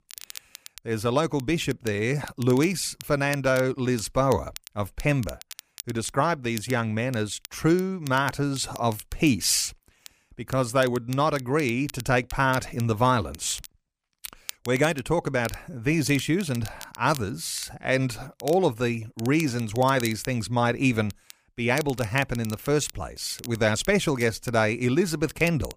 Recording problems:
crackle, like an old record; noticeable; 20 dB below the speech

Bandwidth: 15 kHz